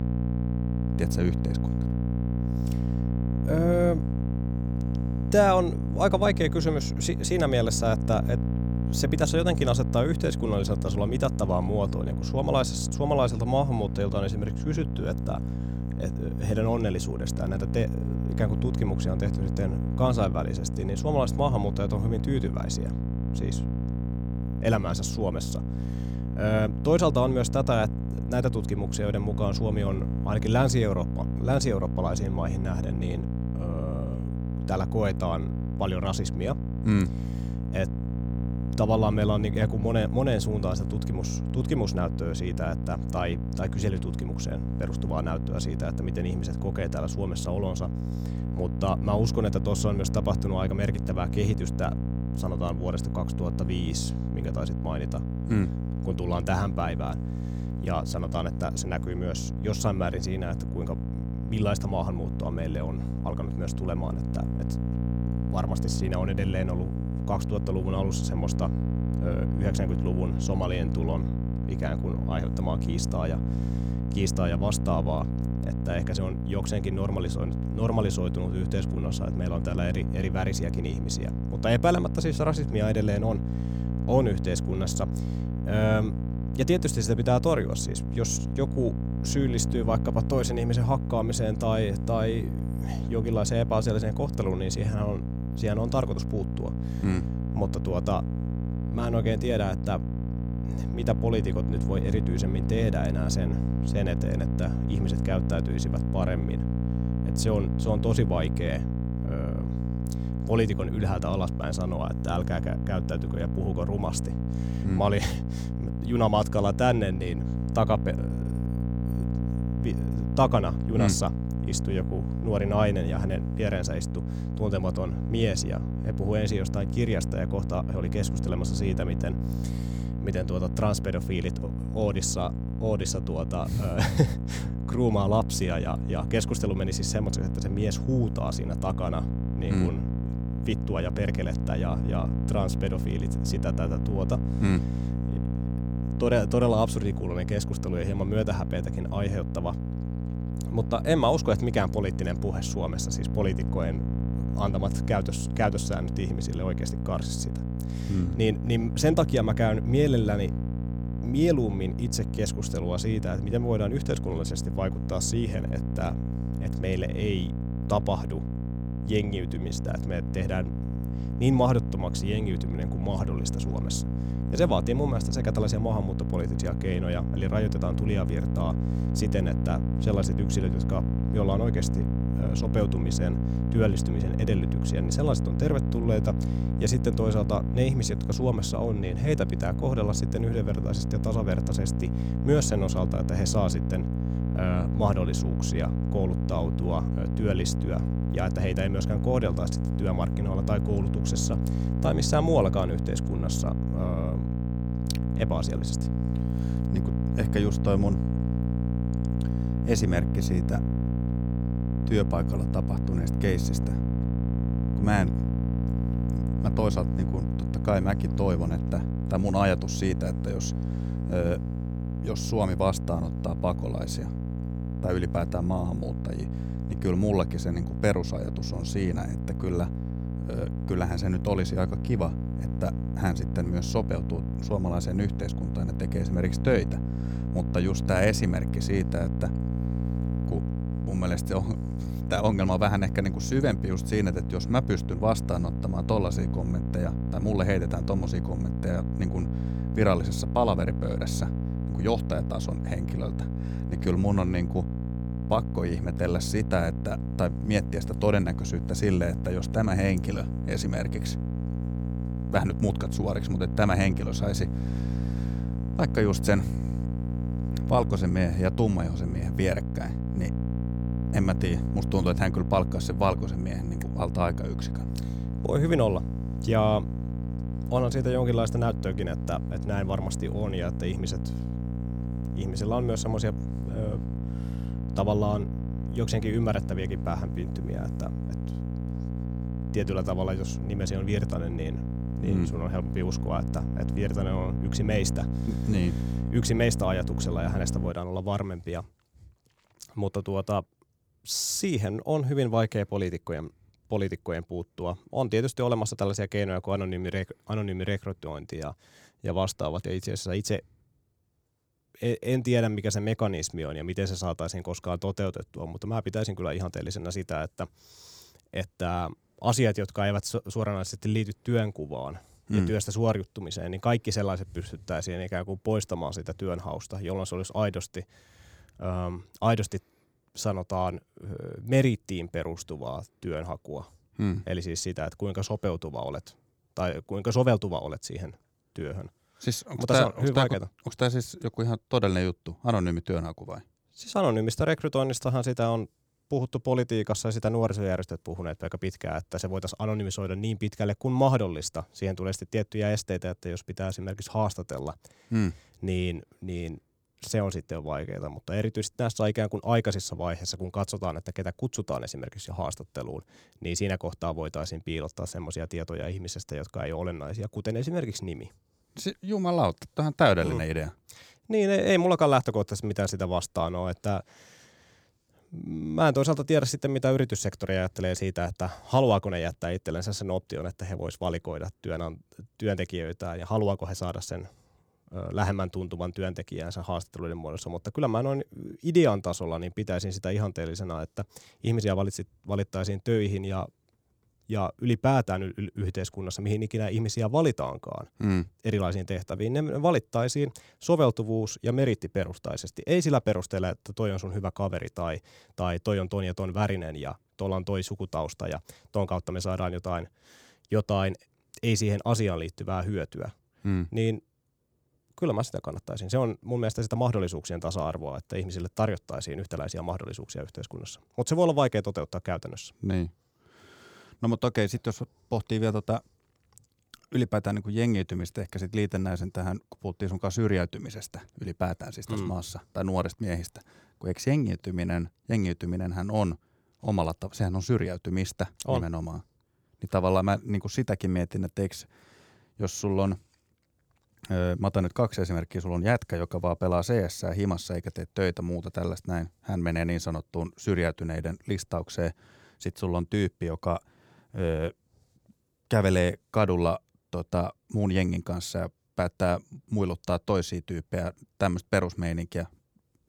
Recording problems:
electrical hum; loud; until 4:58; 60 Hz, 8 dB below the speech

